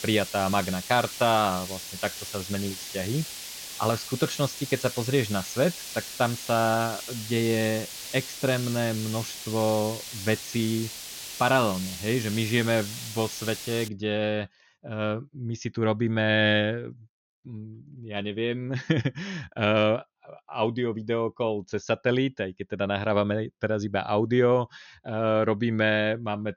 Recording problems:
high frequencies cut off; noticeable; nothing above 6.5 kHz
hiss; loud; until 14 s; 9 dB below the speech

